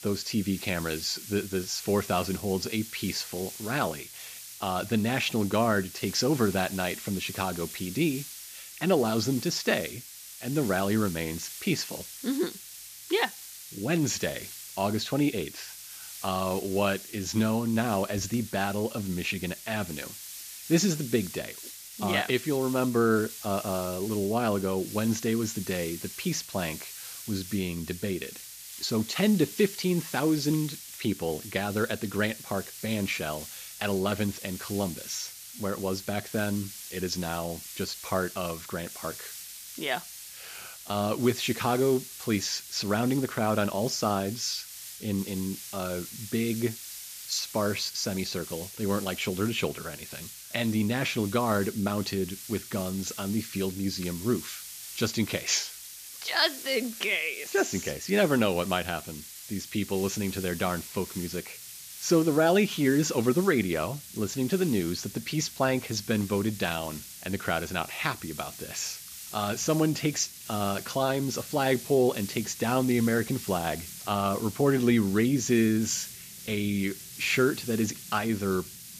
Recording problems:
high frequencies cut off; noticeable; nothing above 8 kHz
hiss; noticeable; throughout; 10 dB below the speech

